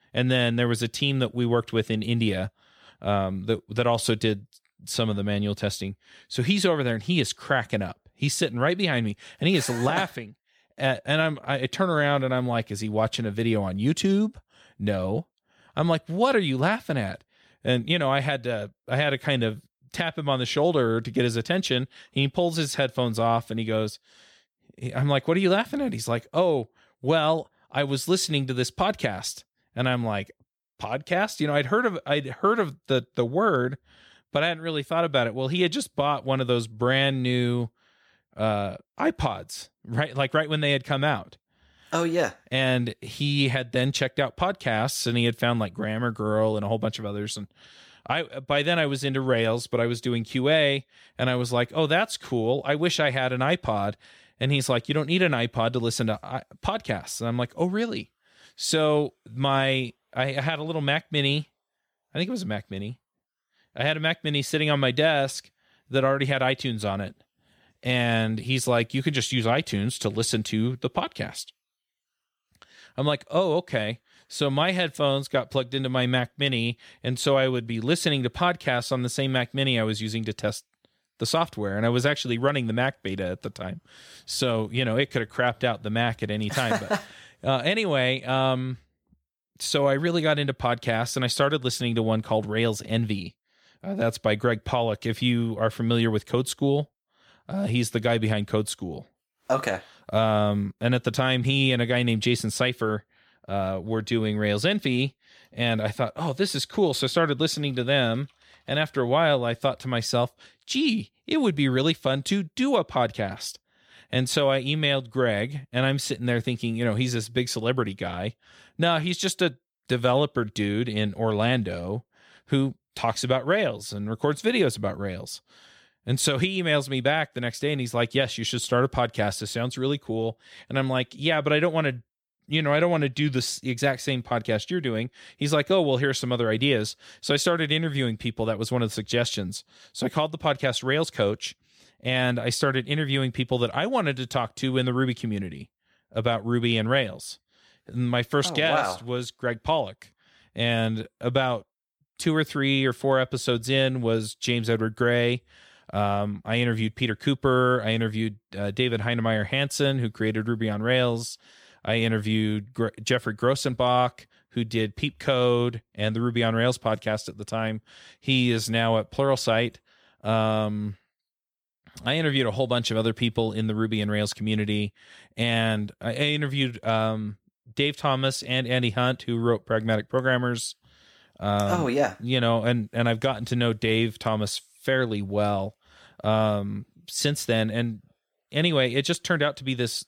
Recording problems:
none

